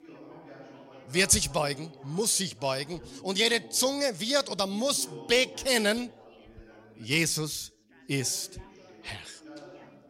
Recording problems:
background chatter; faint; throughout; 3 voices, 20 dB below the speech

